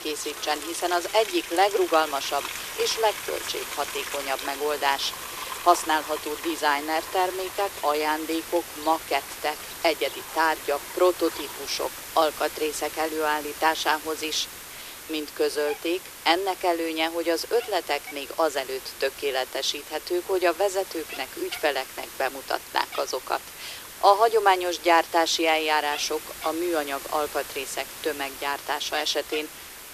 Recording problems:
thin; very; fading below 350 Hz
animal sounds; noticeable; throughout; 10 dB below the speech
hiss; noticeable; throughout; 10 dB below the speech

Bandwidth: 14.5 kHz